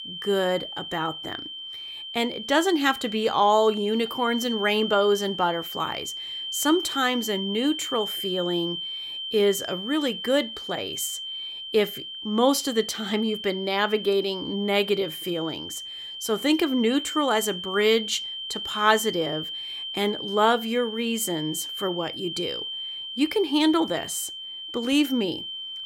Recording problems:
high-pitched whine; loud; throughout; 3 kHz, 7 dB below the speech

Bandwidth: 16 kHz